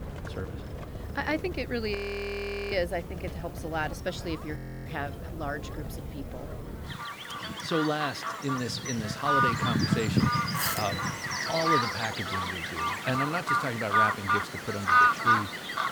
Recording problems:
animal sounds; very loud; throughout; 5 dB above the speech
hiss; faint; throughout; 20 dB below the speech
audio freezing; at 2 s for 1 s and at 4.5 s

